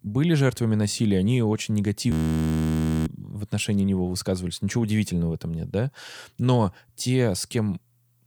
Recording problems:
audio freezing; at 2 s for 1 s

